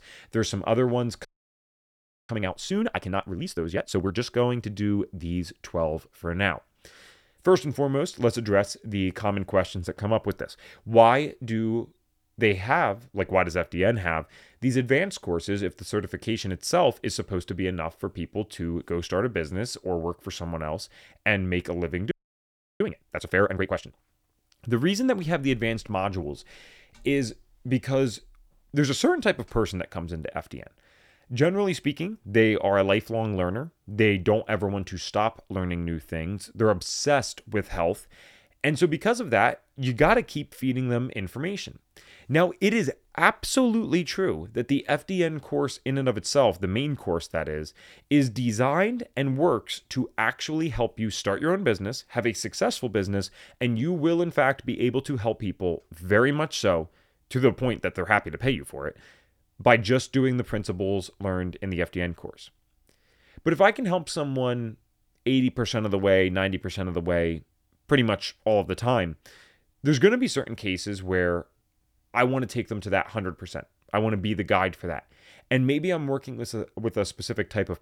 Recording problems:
audio freezing; at 1.5 s for 1 s and at 22 s for 0.5 s

